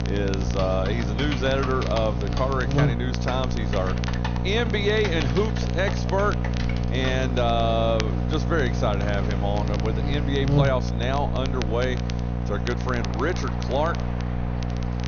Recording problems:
high frequencies cut off; noticeable; nothing above 6.5 kHz
echo of what is said; faint; throughout; 120 ms later, 25 dB below the speech
electrical hum; loud; throughout; 60 Hz, 8 dB below the speech
train or aircraft noise; noticeable; throughout; 20 dB below the speech
crackle, like an old record; noticeable; 15 dB below the speech
keyboard typing; noticeable; until 7.5 s; peak 6 dB below the speech

